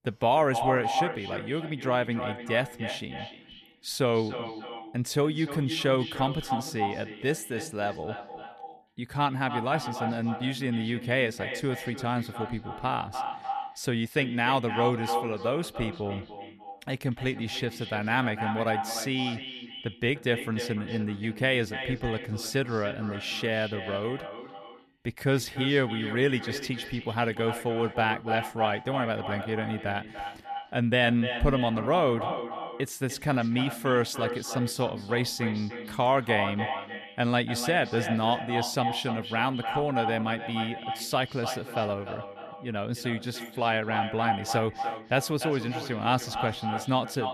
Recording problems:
echo of what is said; strong; throughout; 300 ms later, 7 dB below the speech

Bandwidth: 14.5 kHz